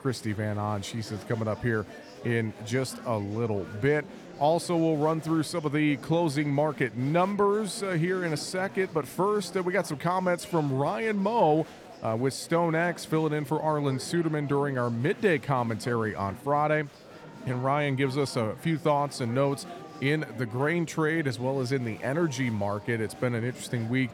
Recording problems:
murmuring crowd; noticeable; throughout; 15 dB below the speech

